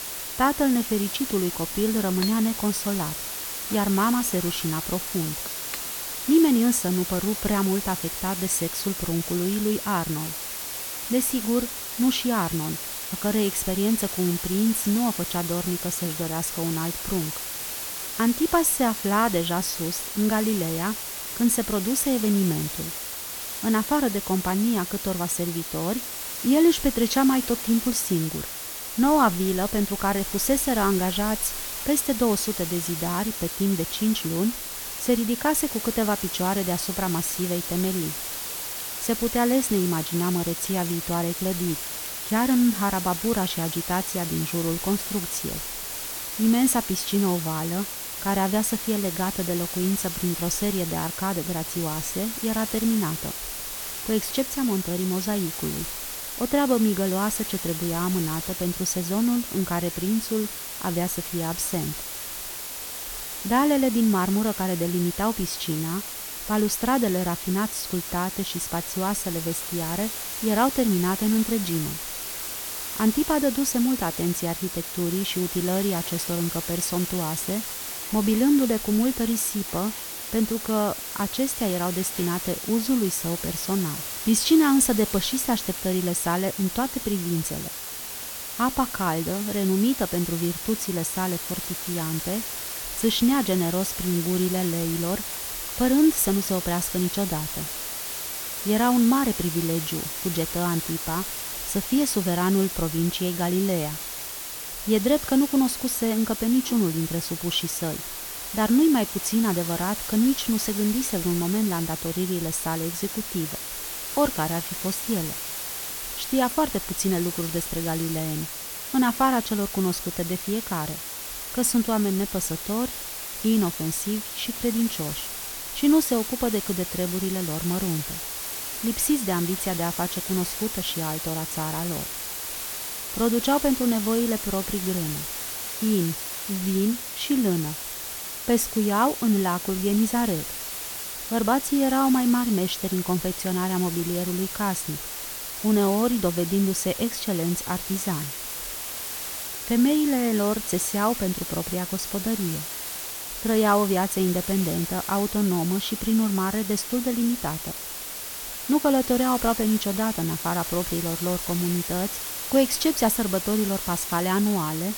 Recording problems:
hiss; loud; throughout; 5 dB below the speech
household noises; faint; until 2:00; 25 dB below the speech

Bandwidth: 18 kHz